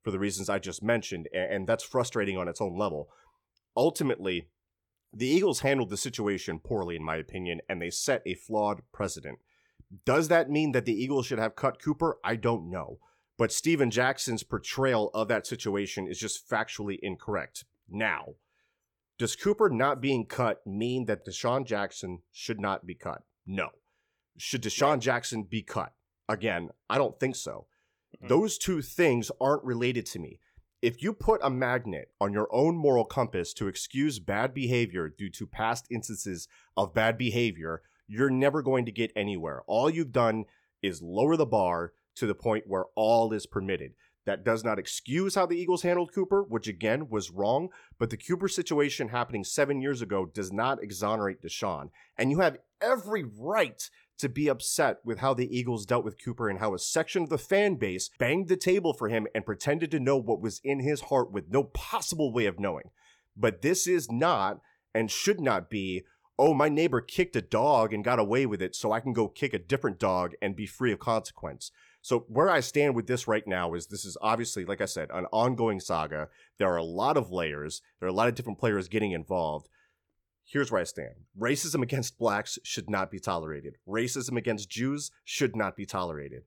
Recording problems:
none

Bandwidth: 18.5 kHz